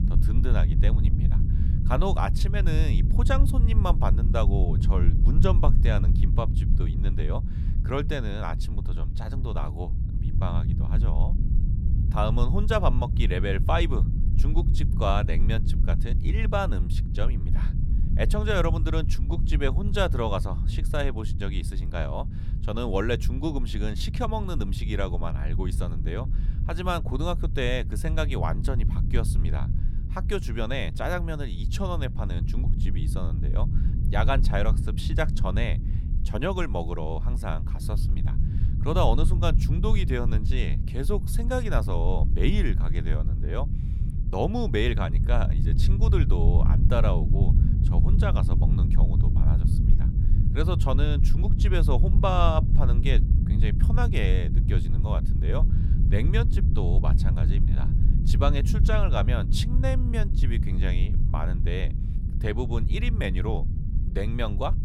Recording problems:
low rumble; loud; throughout; 9 dB below the speech

